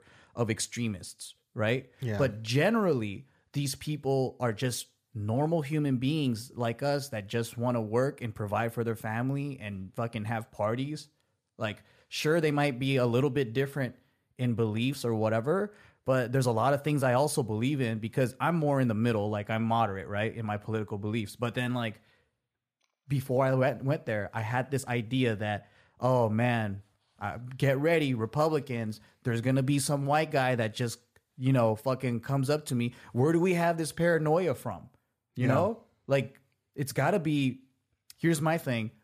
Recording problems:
none

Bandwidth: 14.5 kHz